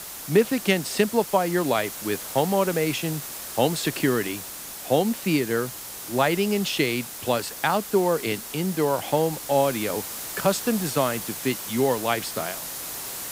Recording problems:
hiss; loud; throughout; 8 dB below the speech

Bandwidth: 15.5 kHz